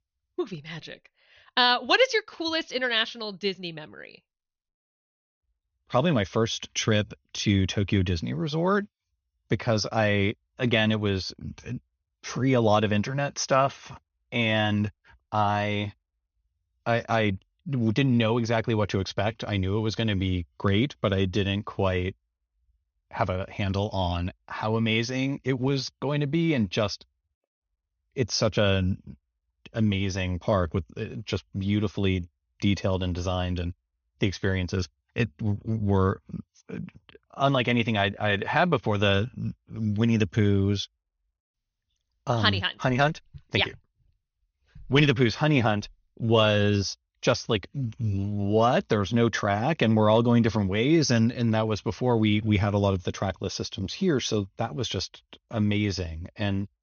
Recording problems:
high frequencies cut off; noticeable; nothing above 6.5 kHz

